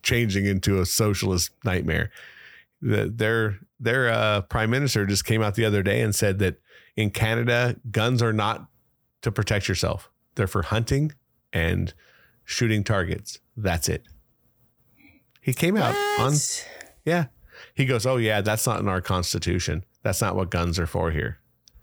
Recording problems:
none

